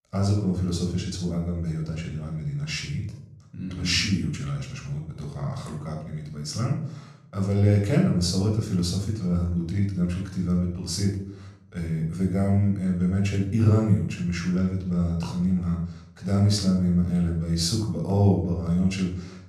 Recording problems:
room echo; noticeable; dies away in 0.6 s
off-mic speech; somewhat distant

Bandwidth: 14.5 kHz